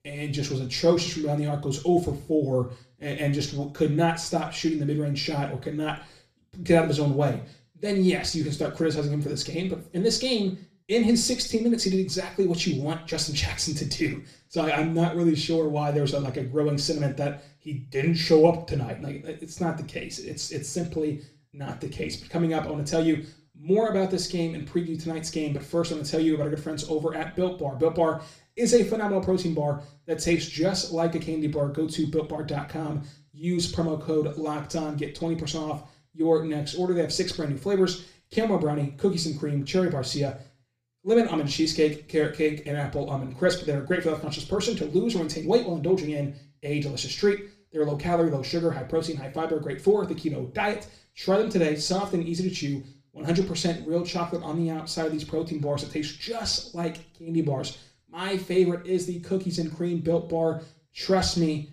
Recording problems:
room echo; slight; dies away in 0.4 s
off-mic speech; somewhat distant

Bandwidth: 15 kHz